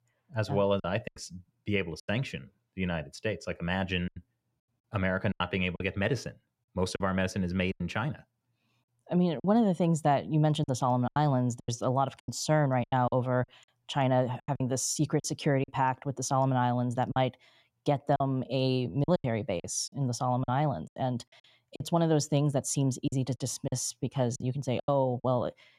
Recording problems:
choppy; very; 9% of the speech affected

